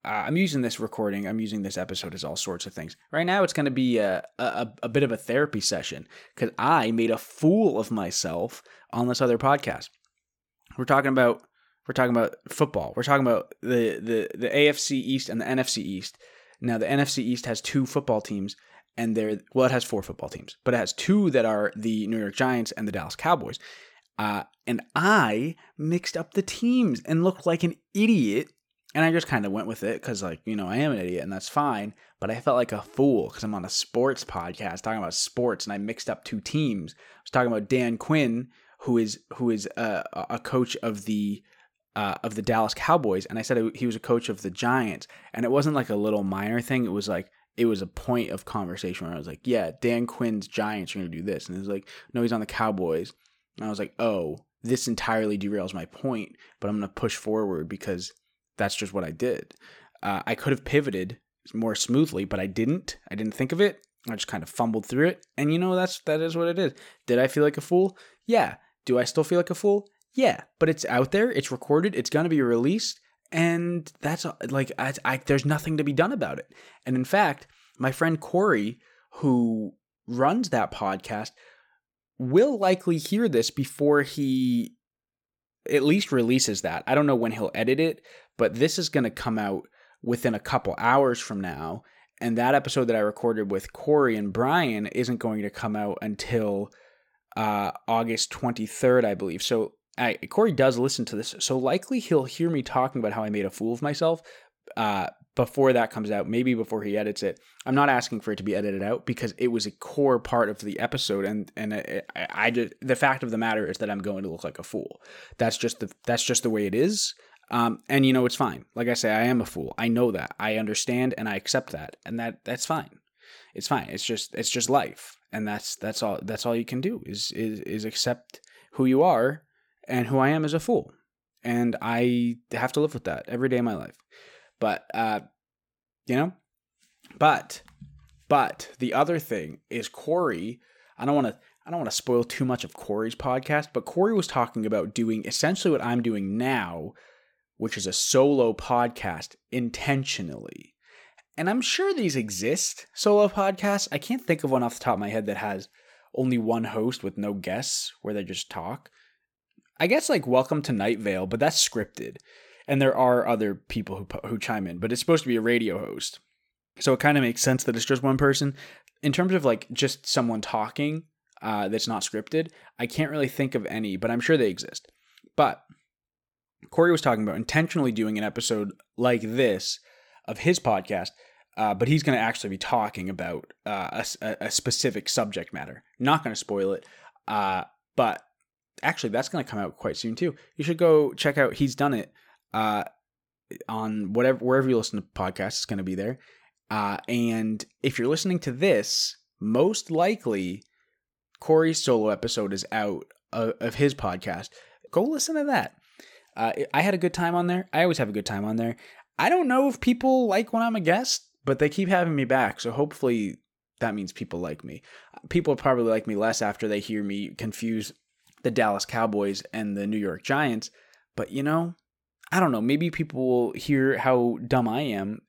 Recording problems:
none

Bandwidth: 17.5 kHz